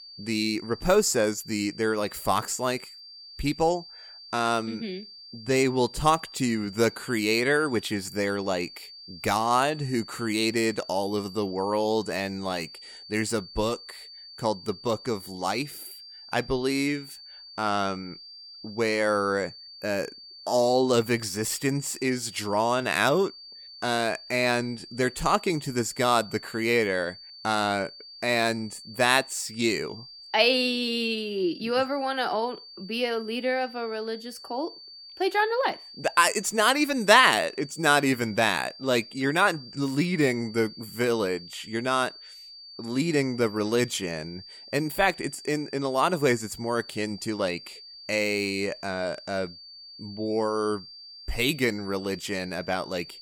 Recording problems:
high-pitched whine; noticeable; throughout; 4.5 kHz, 15 dB below the speech

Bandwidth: 17.5 kHz